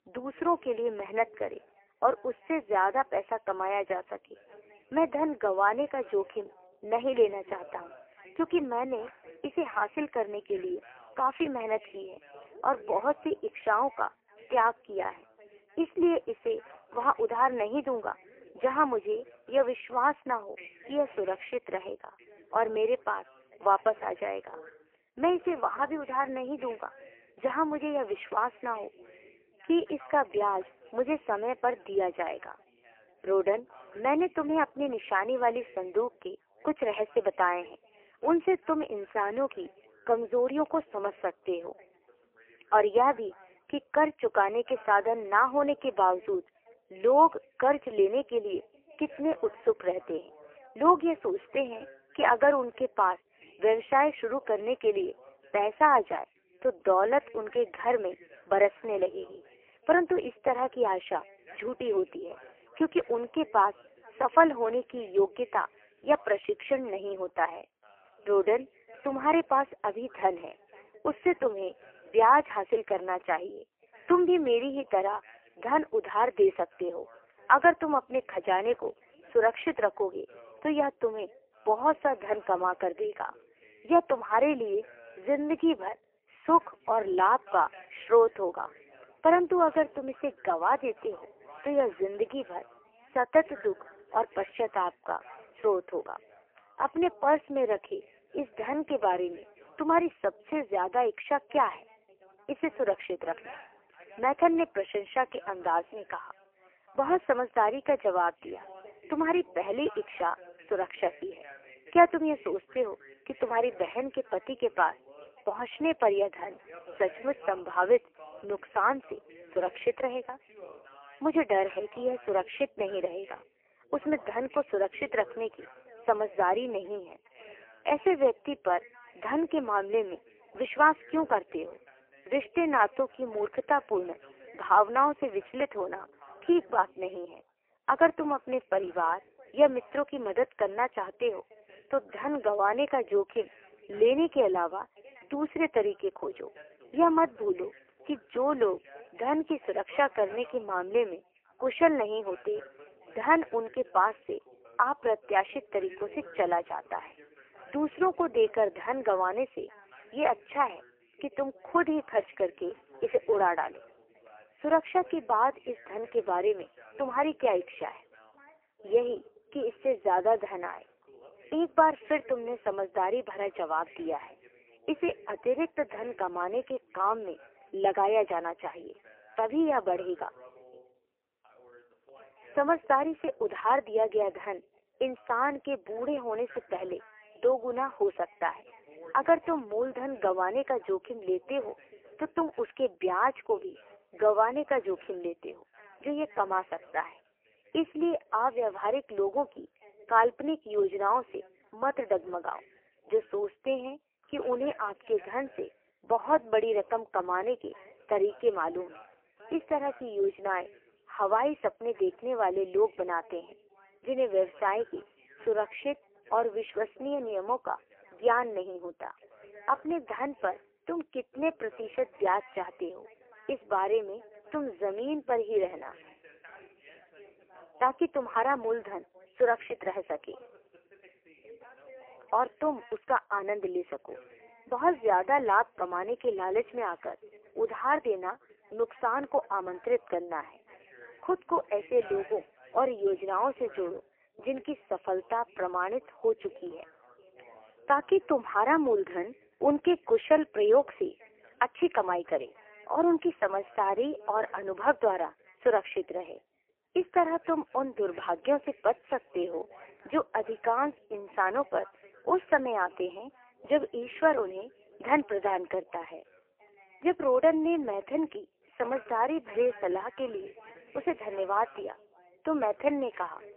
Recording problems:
phone-call audio; poor line; nothing above 3 kHz
background chatter; faint; throughout; 2 voices, 25 dB below the speech

